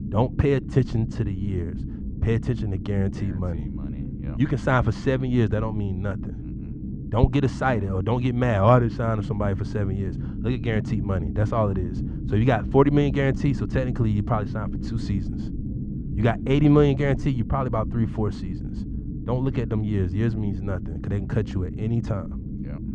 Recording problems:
muffled; very; fading above 2 kHz
low rumble; noticeable; throughout; 15 dB below the speech

